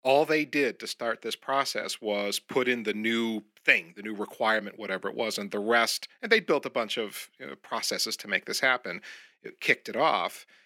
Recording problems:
thin; very slightly; fading below 300 Hz

